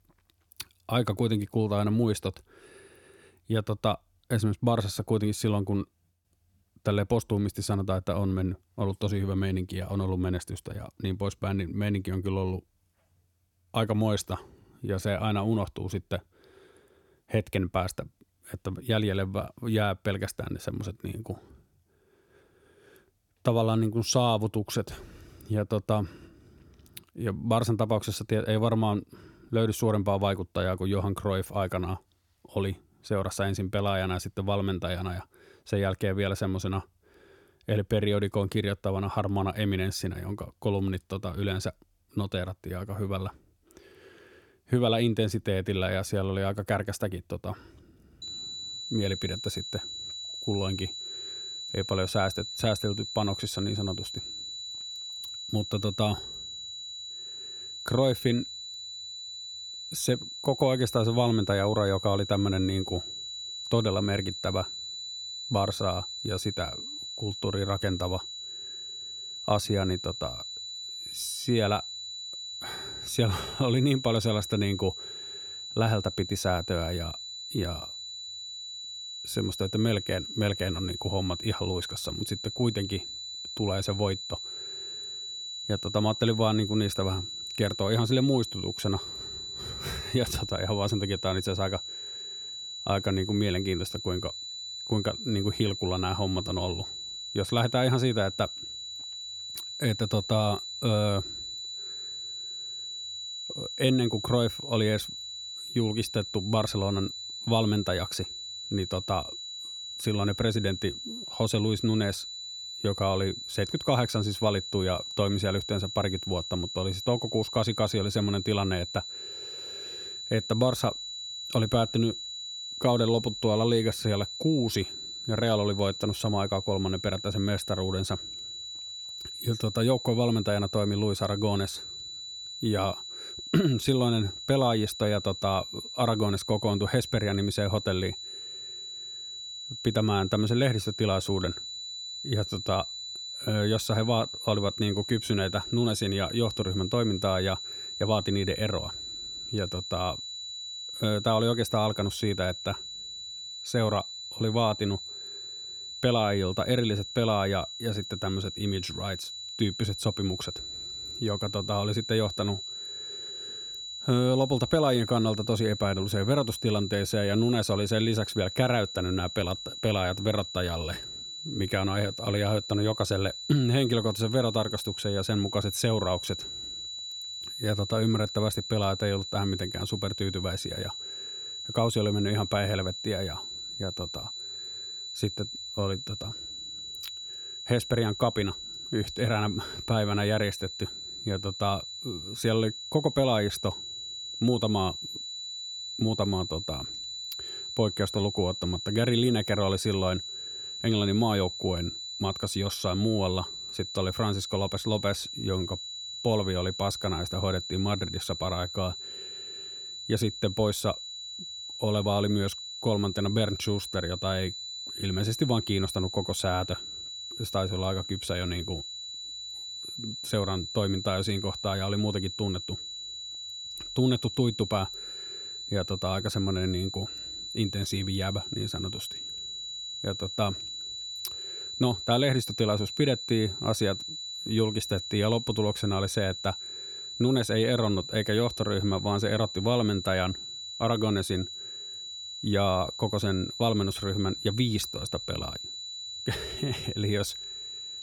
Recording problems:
high-pitched whine; loud; from 48 s on; 4 kHz, 7 dB below the speech

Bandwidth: 17.5 kHz